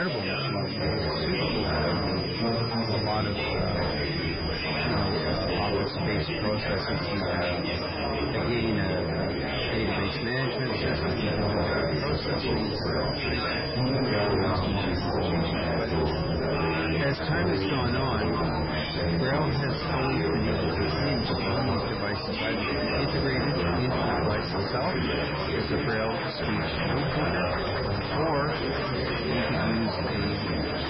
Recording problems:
garbled, watery; badly; nothing above 5.5 kHz
distortion; slight; 9 dB below the speech
chatter from many people; very loud; throughout; 3 dB above the speech
high-pitched whine; loud; throughout; 5 kHz, 7 dB below the speech
abrupt cut into speech; at the start

